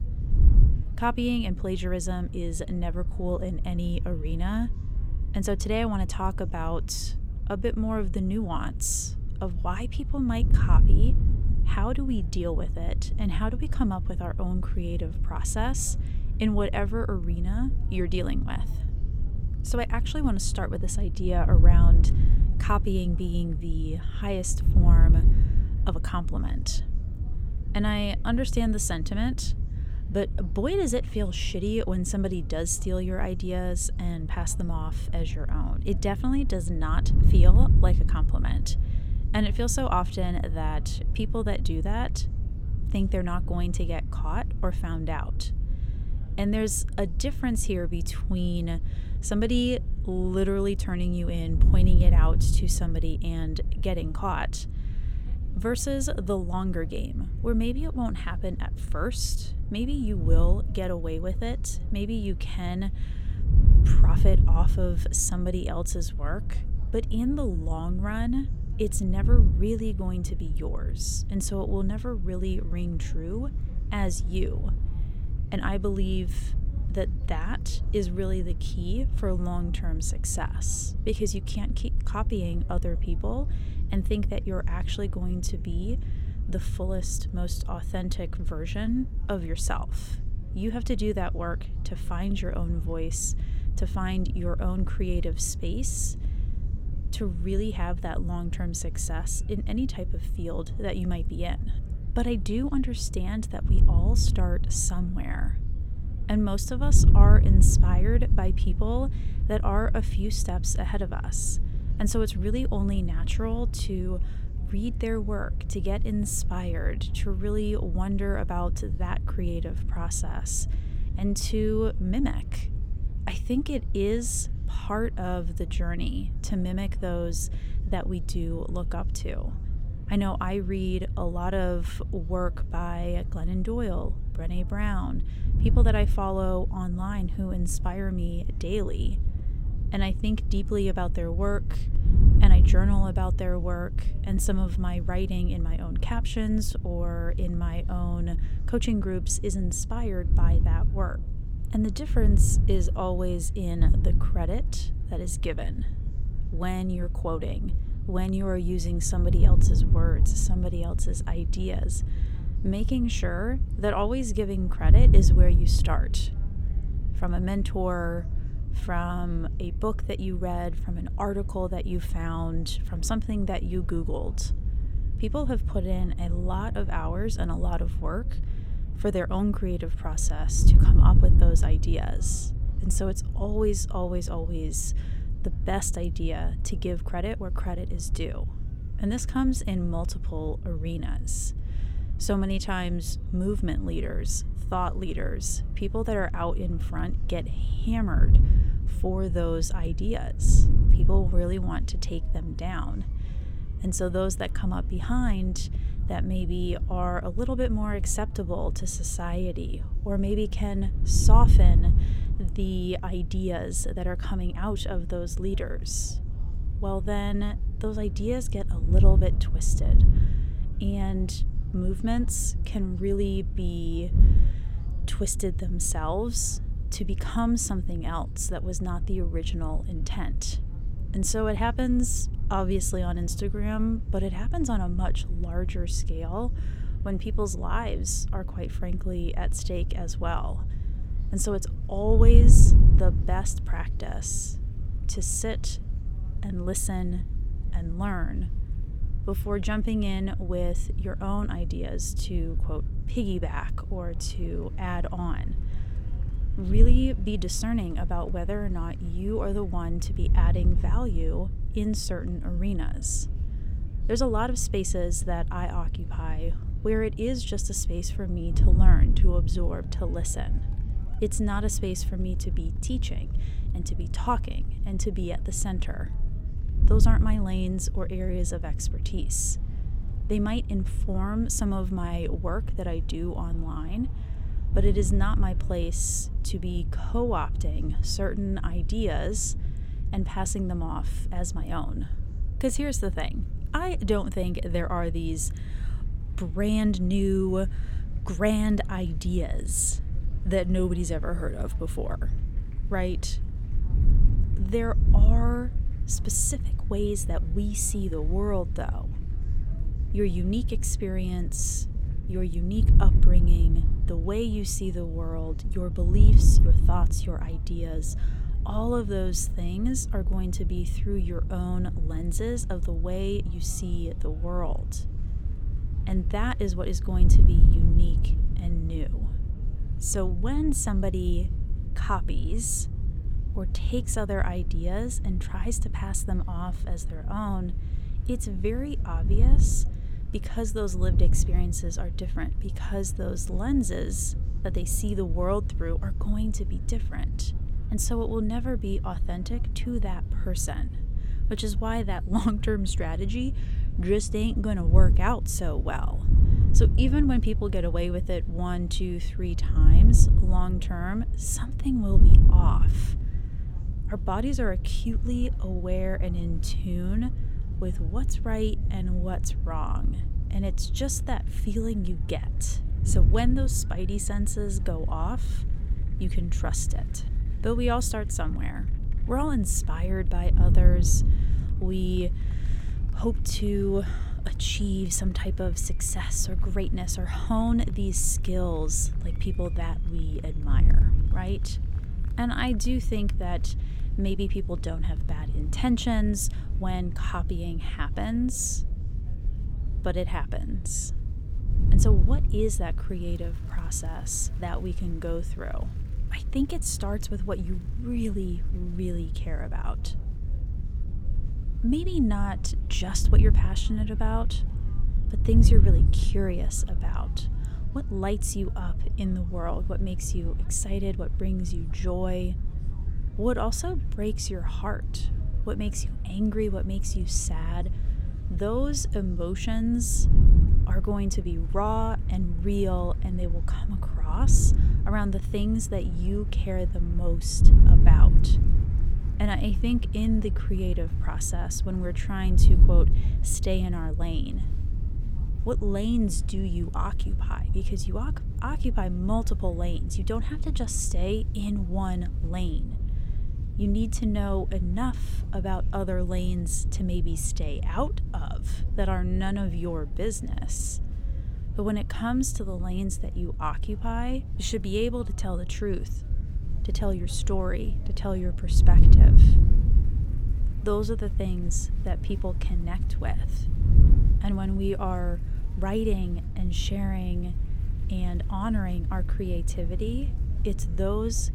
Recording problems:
wind noise on the microphone; occasional gusts; 10 dB below the speech
murmuring crowd; faint; throughout; 25 dB below the speech

